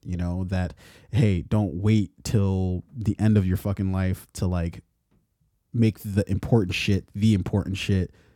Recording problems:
none

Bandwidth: 18 kHz